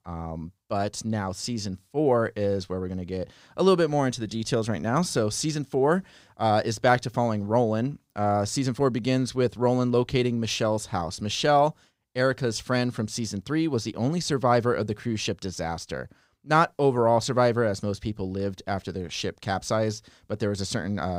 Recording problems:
abrupt cut into speech; at the end

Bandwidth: 15.5 kHz